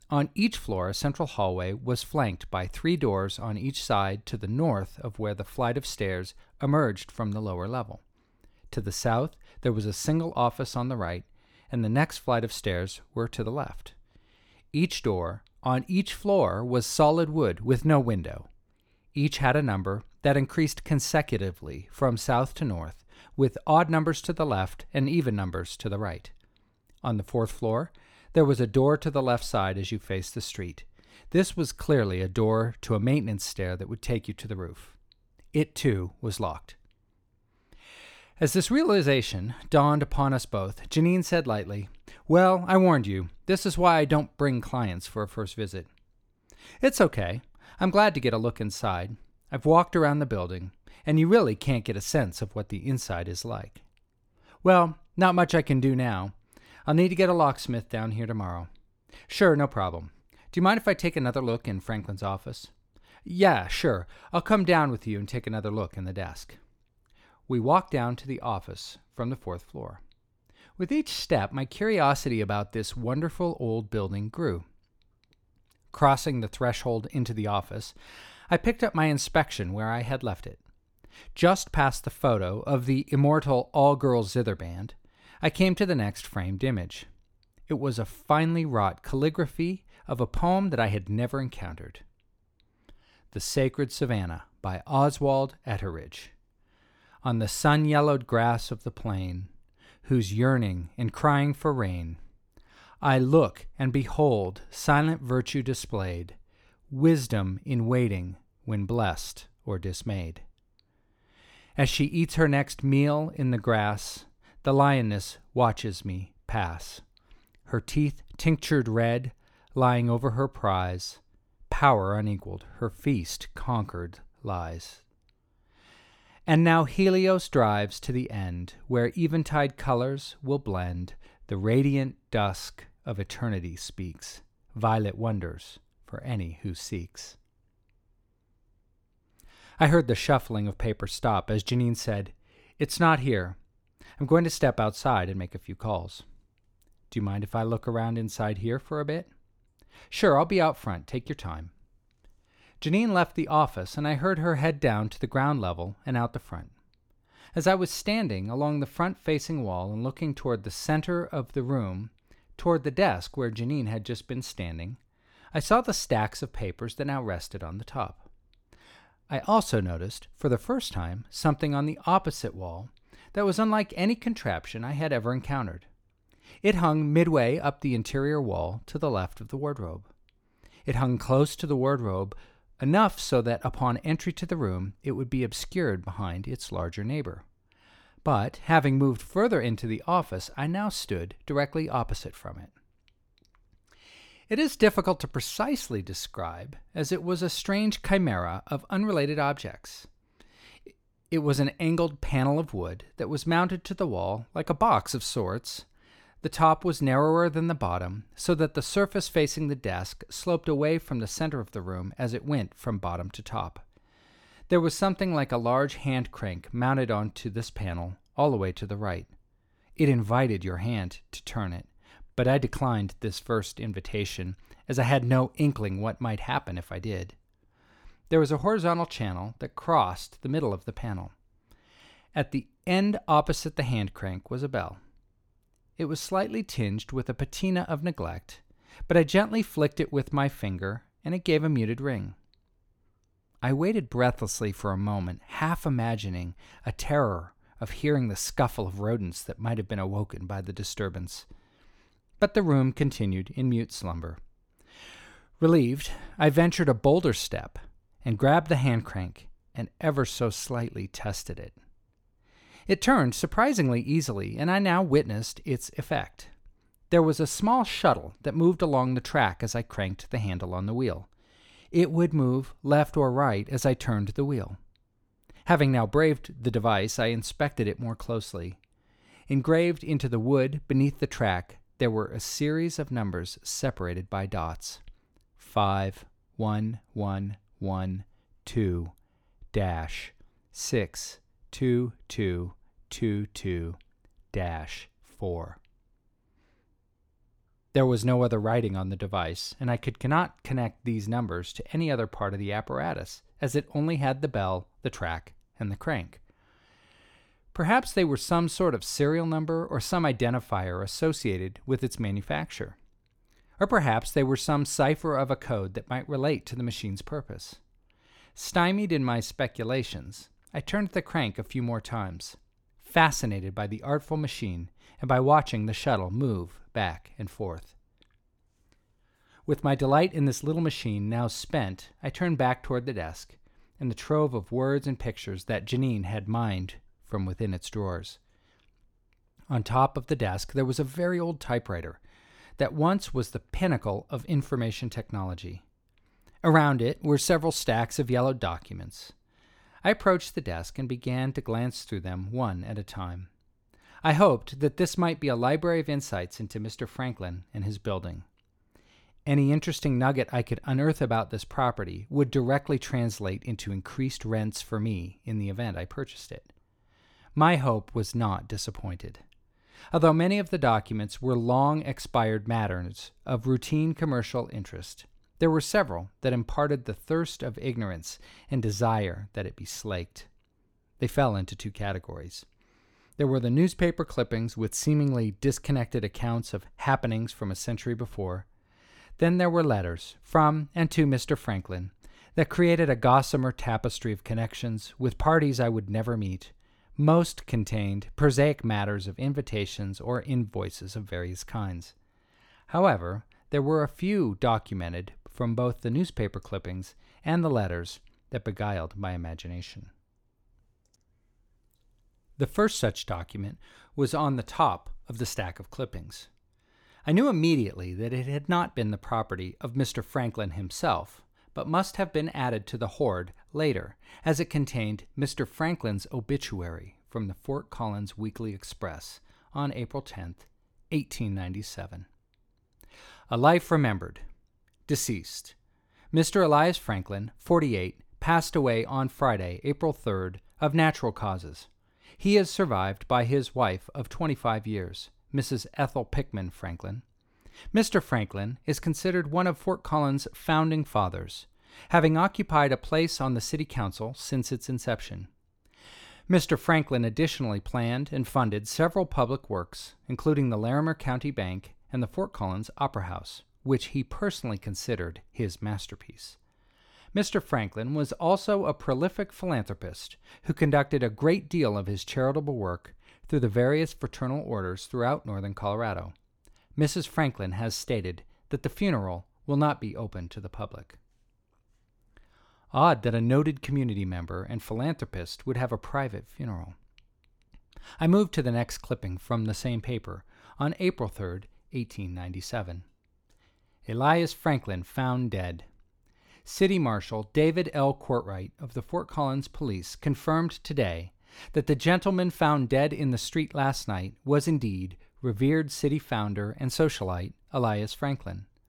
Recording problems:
none

